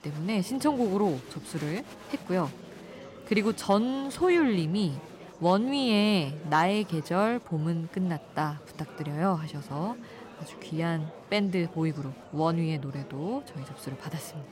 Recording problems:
murmuring crowd; noticeable; throughout; 15 dB below the speech

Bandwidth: 16 kHz